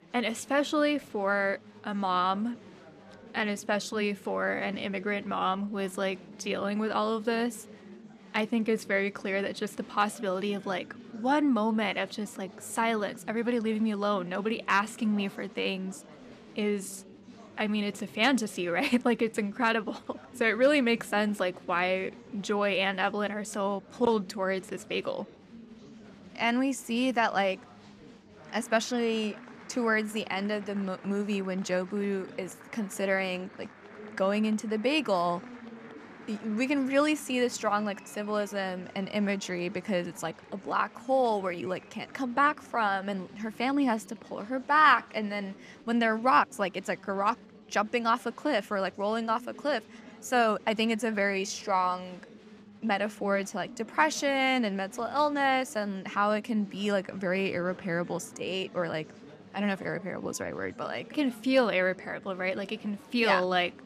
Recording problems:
chatter from many people; faint; throughout; 20 dB below the speech

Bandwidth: 14.5 kHz